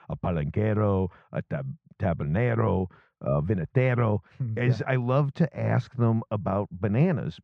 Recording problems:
muffled; very; fading above 1.5 kHz

